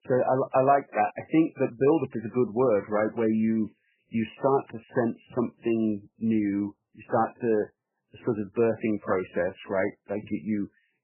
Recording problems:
garbled, watery; badly; nothing above 3 kHz

